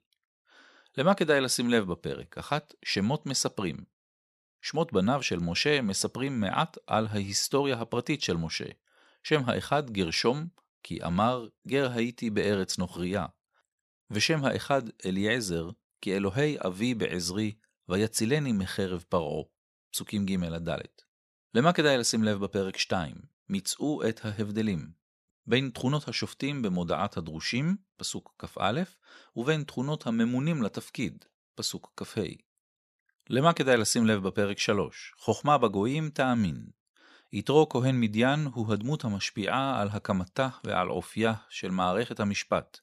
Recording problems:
none

